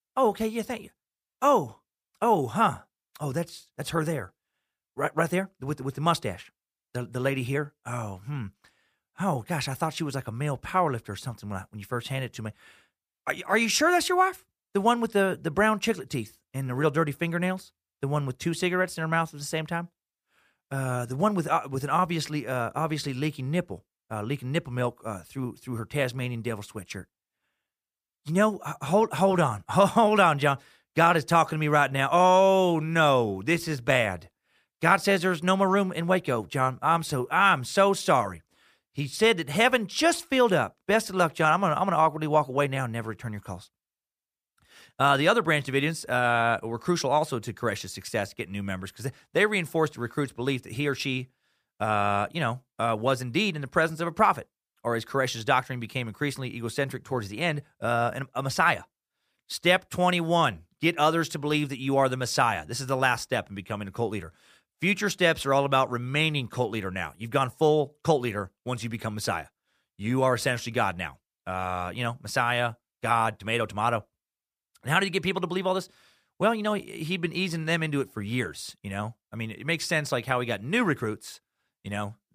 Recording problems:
none

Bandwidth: 15 kHz